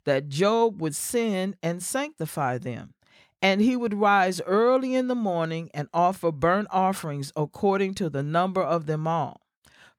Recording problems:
none

